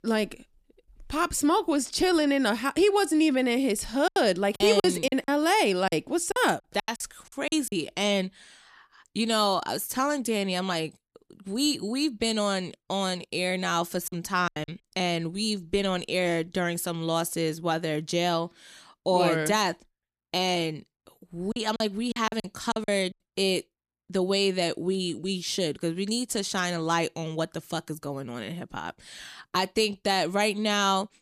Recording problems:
choppy; very; from 4 to 7.5 s, at 14 s and from 22 to 23 s; 17% of the speech affected

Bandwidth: 14.5 kHz